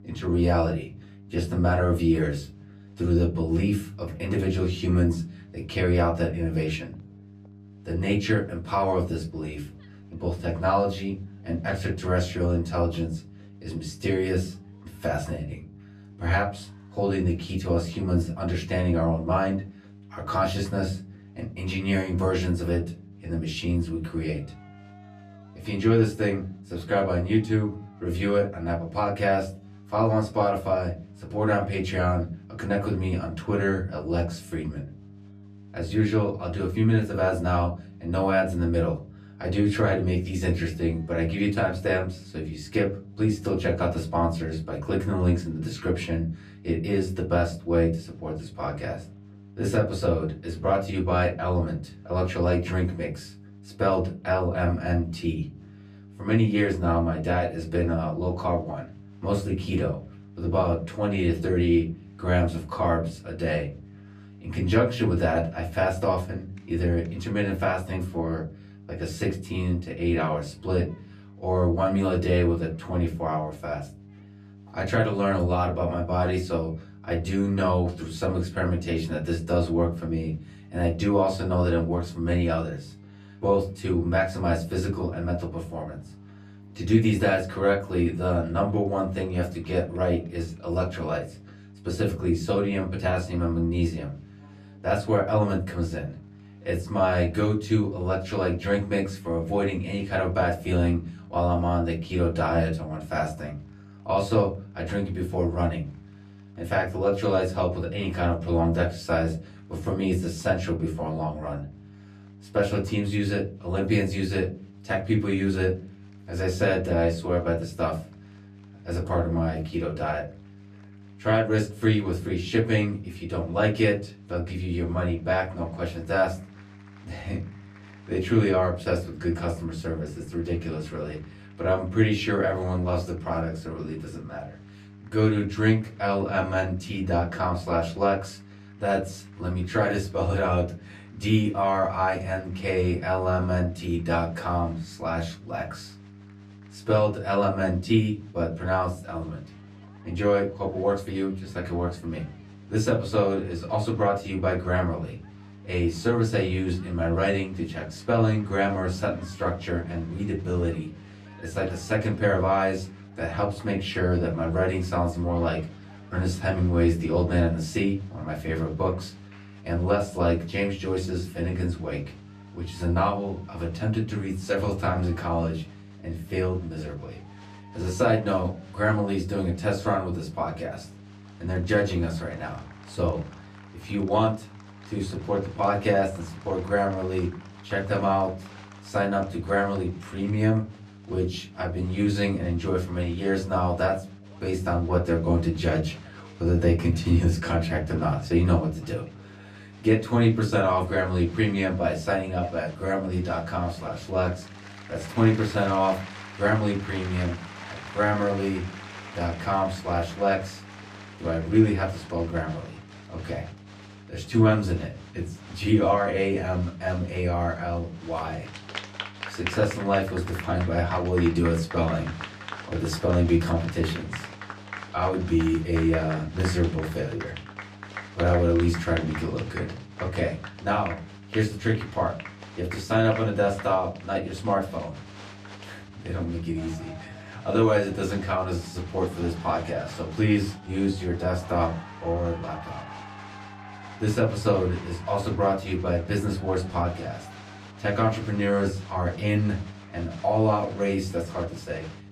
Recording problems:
off-mic speech; far
room echo; very slight; dies away in 0.4 s
crowd noise; noticeable; throughout; 20 dB below the speech
electrical hum; faint; throughout; 50 Hz, 30 dB below the speech

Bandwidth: 14.5 kHz